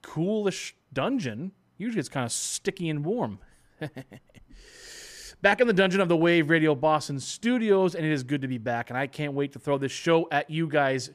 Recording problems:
none

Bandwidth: 14.5 kHz